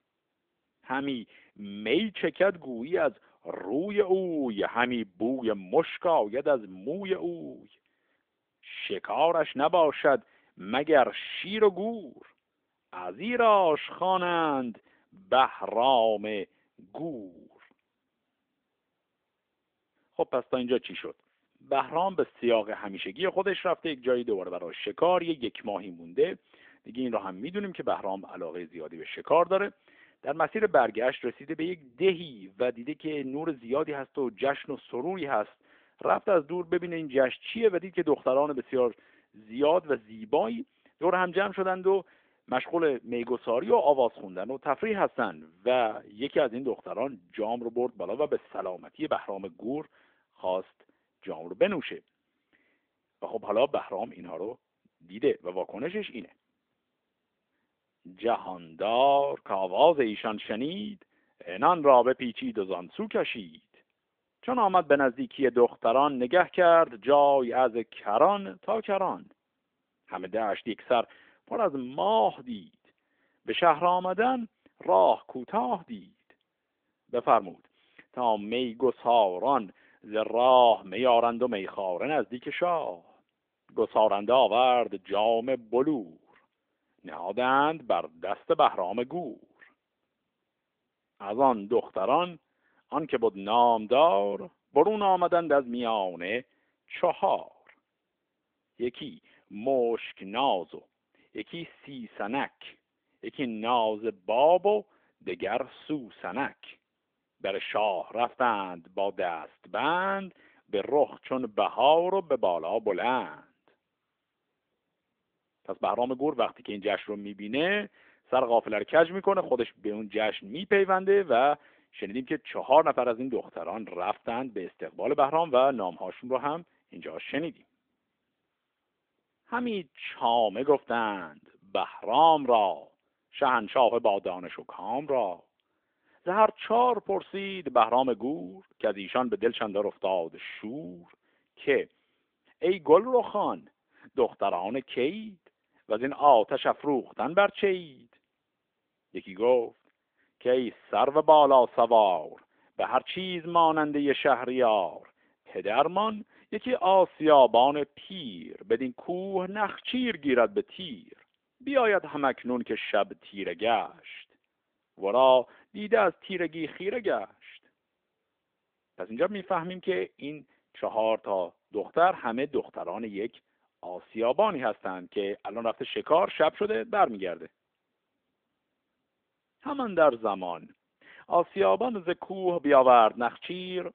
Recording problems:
phone-call audio; nothing above 3.5 kHz

